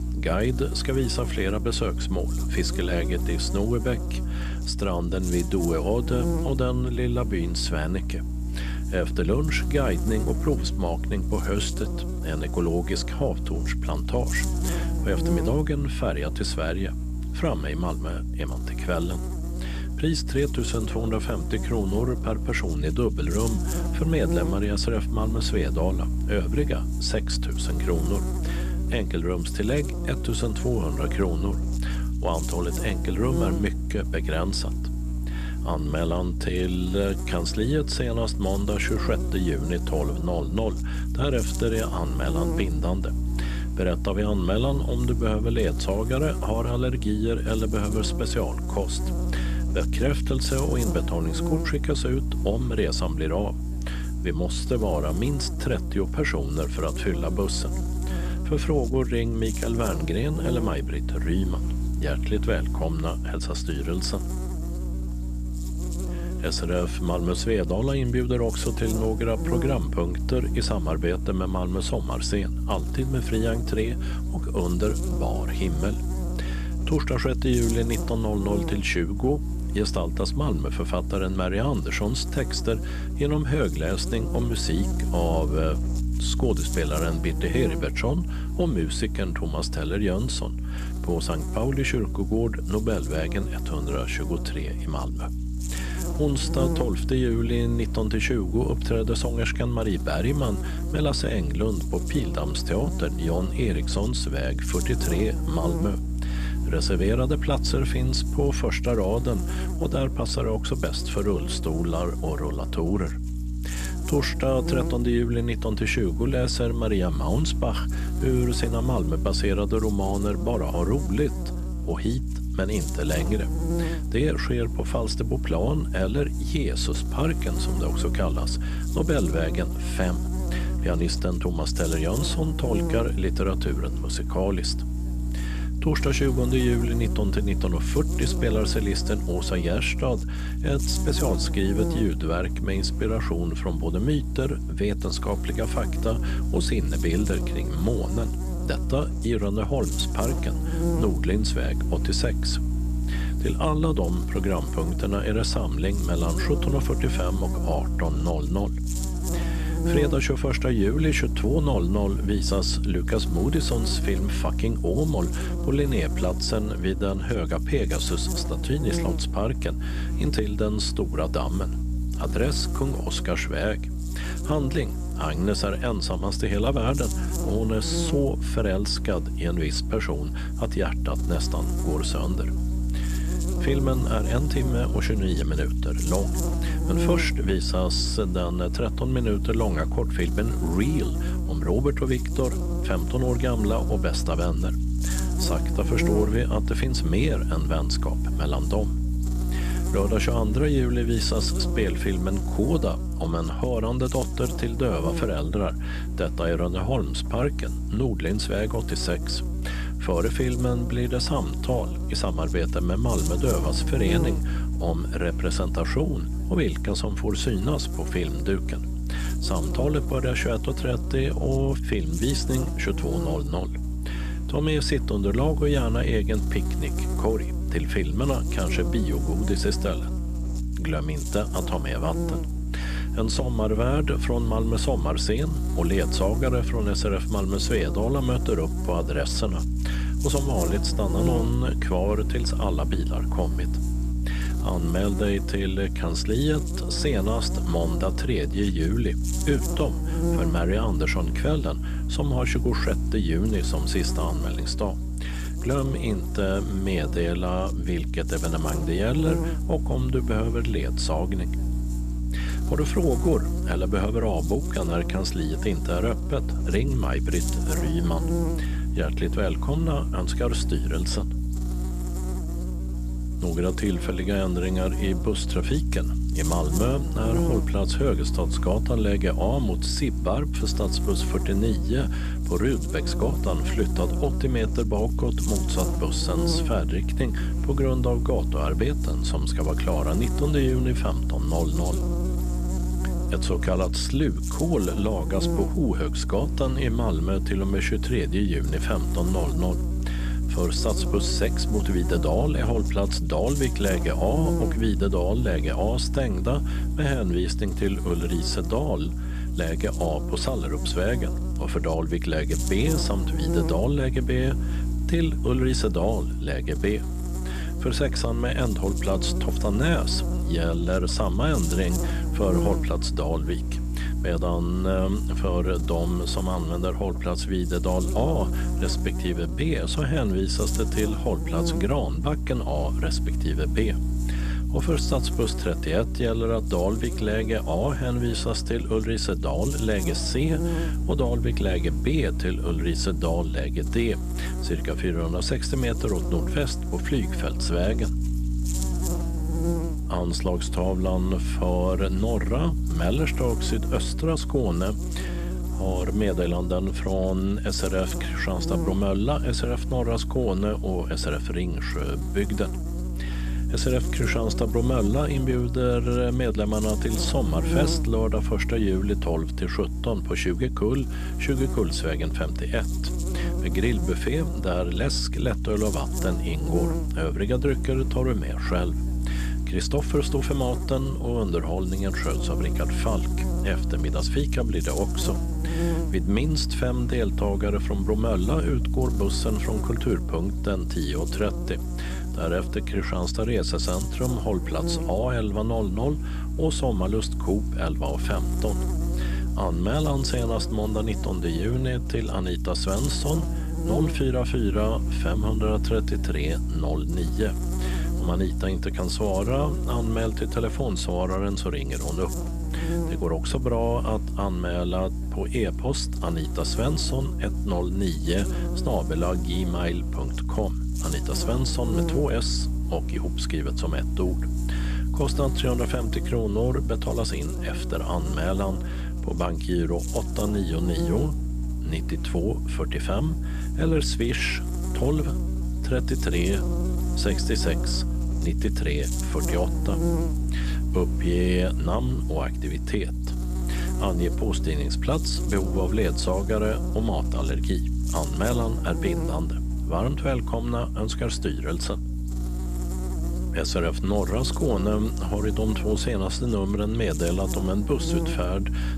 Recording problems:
electrical hum; loud; throughout; 60 Hz, 8 dB below the speech

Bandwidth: 14 kHz